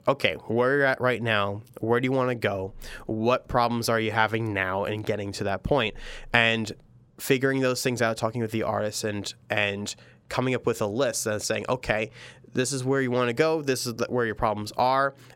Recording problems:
none

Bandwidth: 16 kHz